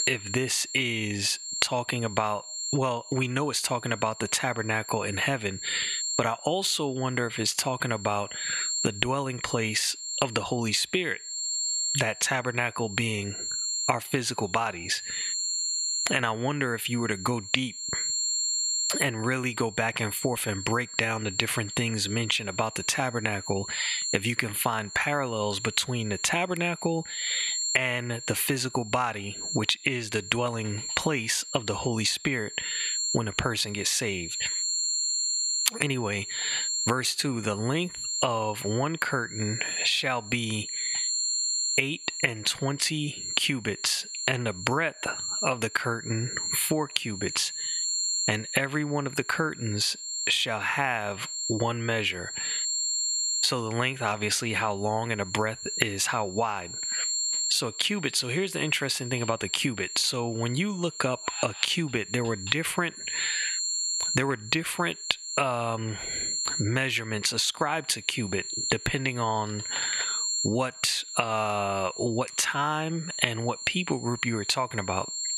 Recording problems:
thin; somewhat; fading below 600 Hz
squashed, flat; somewhat
high-pitched whine; loud; throughout; 7.5 kHz, 3 dB below the speech

